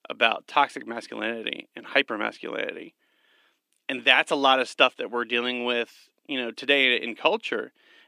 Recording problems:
thin; very slightly; fading below 250 Hz

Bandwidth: 15 kHz